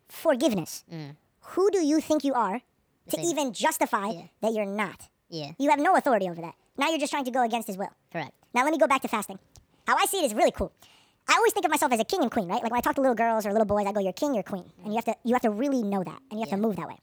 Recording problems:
wrong speed and pitch; too fast and too high; 1.5 times normal speed

